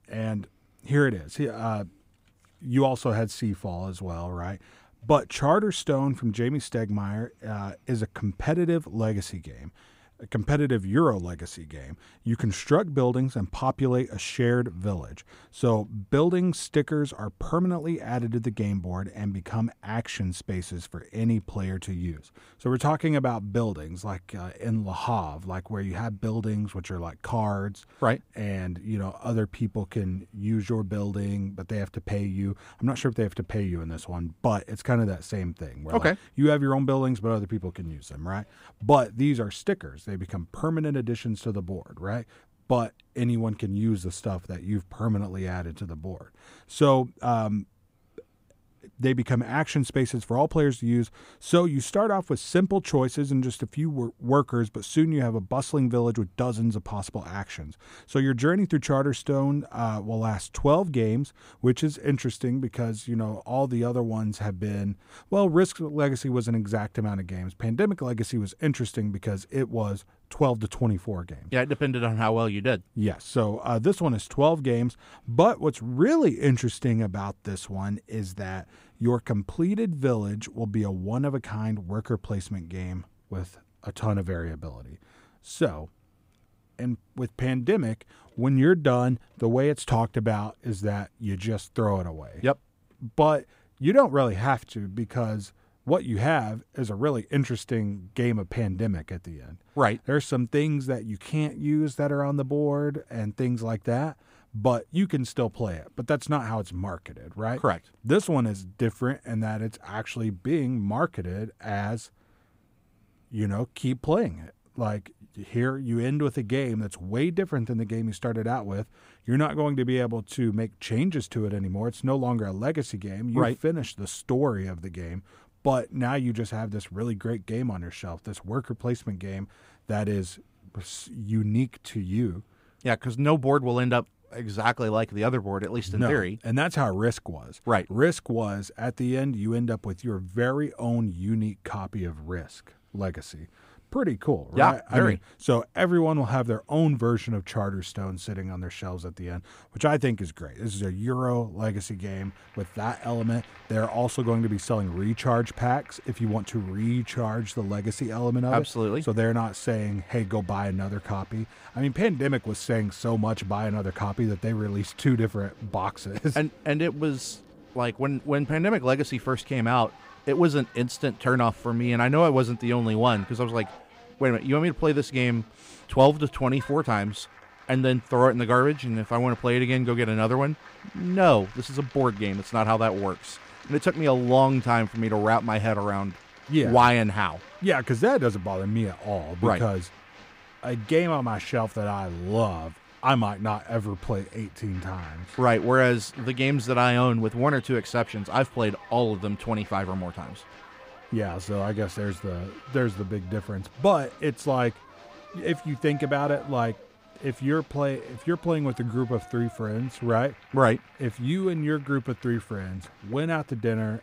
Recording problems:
crowd noise; faint; from 2:32 on; 20 dB below the speech

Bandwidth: 15.5 kHz